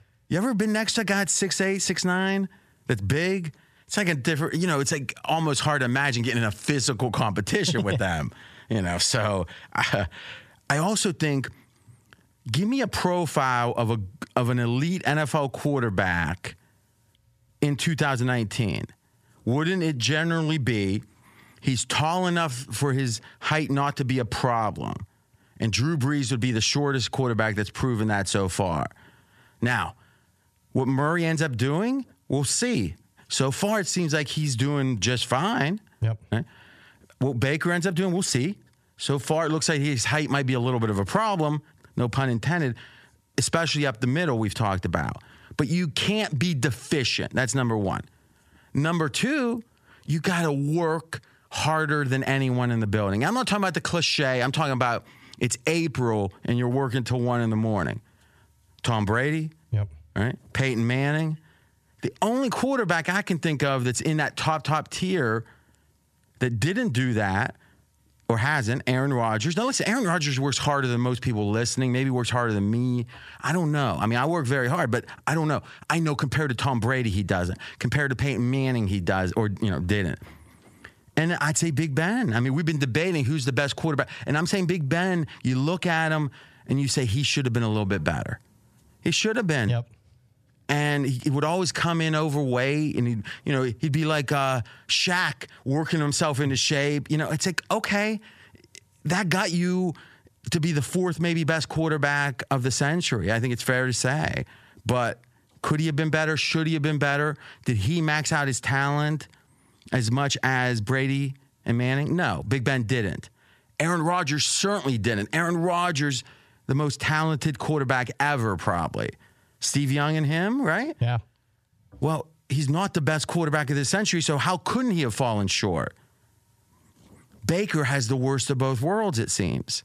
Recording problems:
squashed, flat; somewhat

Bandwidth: 14.5 kHz